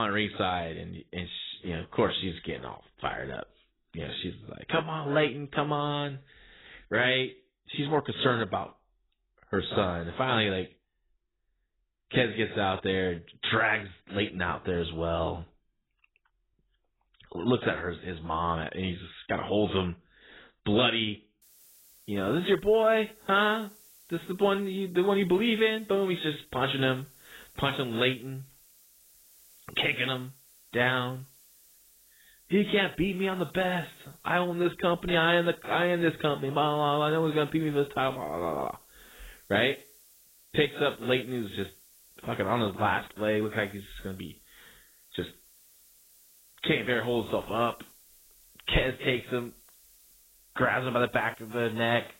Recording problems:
garbled, watery; badly; nothing above 4 kHz
hiss; faint; from 21 s on; 25 dB below the speech
abrupt cut into speech; at the start

